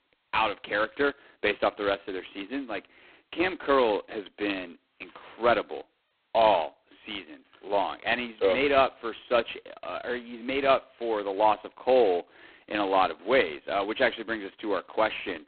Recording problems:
phone-call audio; poor line; nothing above 4 kHz

